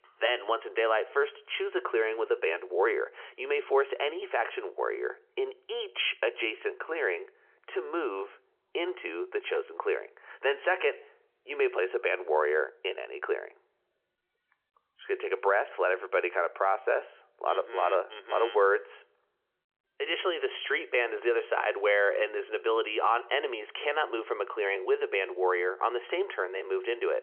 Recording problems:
phone-call audio; nothing above 3.5 kHz

